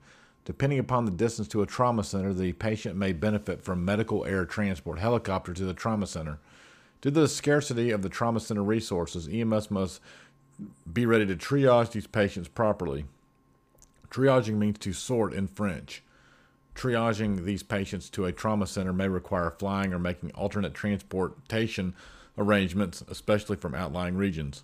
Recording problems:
none

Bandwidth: 15 kHz